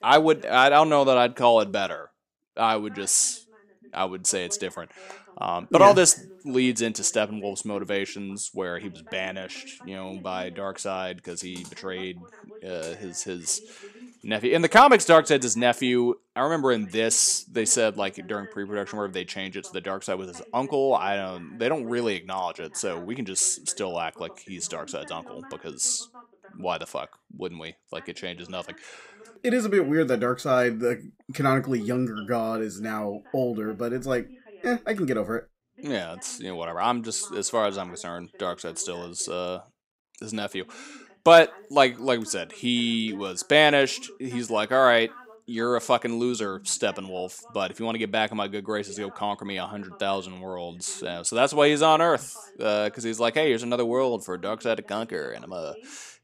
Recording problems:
voice in the background; faint; throughout; 25 dB below the speech

